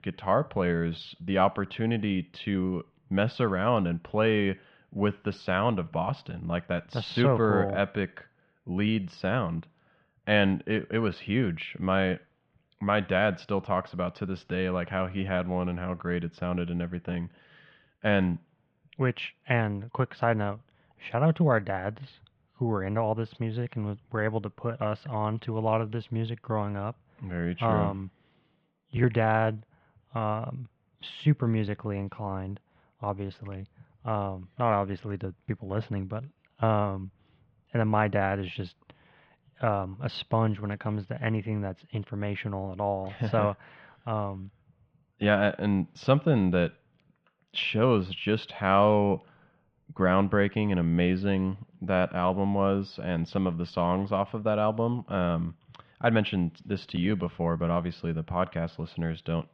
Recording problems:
muffled; very; fading above 3 kHz

